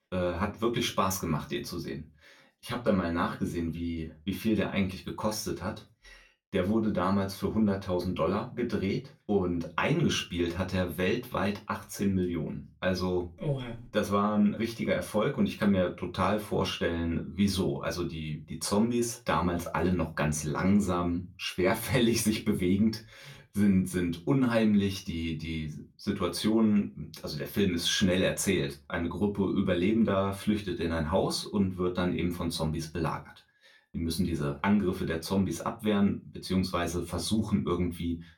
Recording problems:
room echo; very slight; dies away in 0.2 s
off-mic speech; somewhat distant

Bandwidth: 17.5 kHz